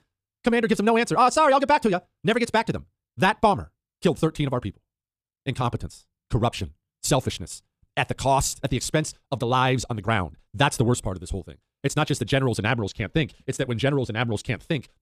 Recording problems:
wrong speed, natural pitch; too fast; 1.8 times normal speed

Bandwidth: 14.5 kHz